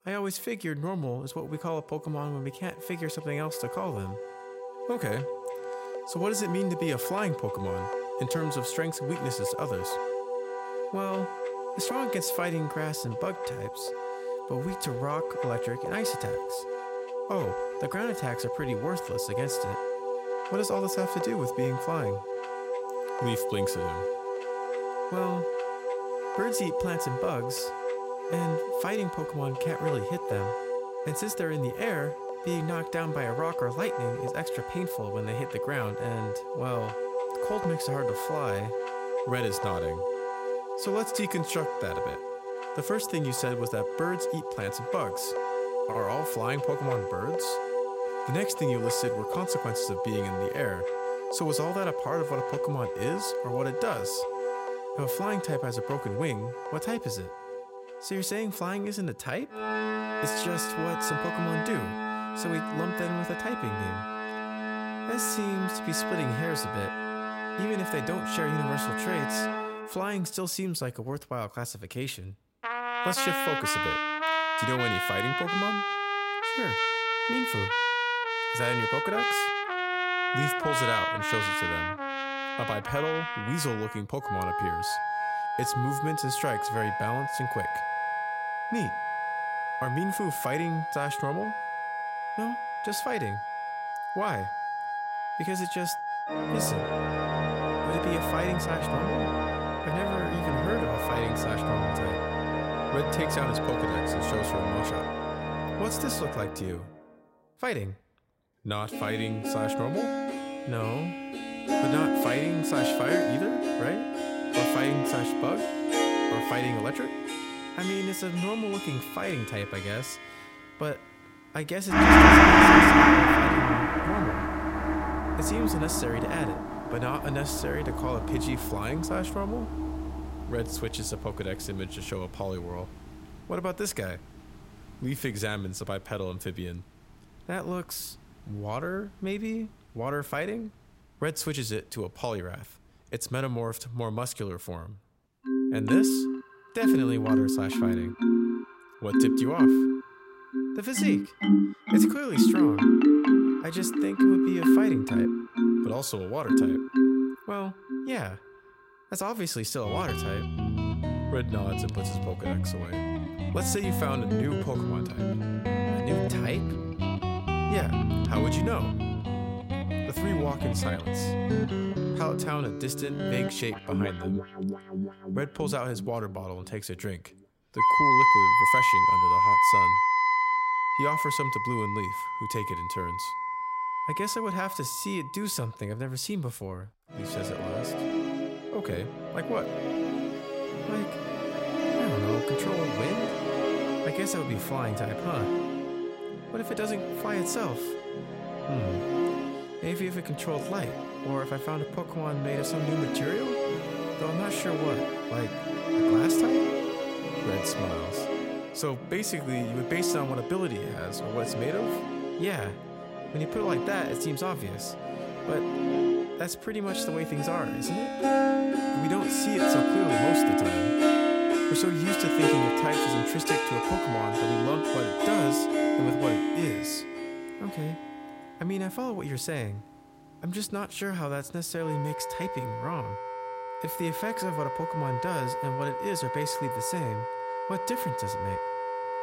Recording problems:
background music; very loud; throughout; 5 dB above the speech

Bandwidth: 16 kHz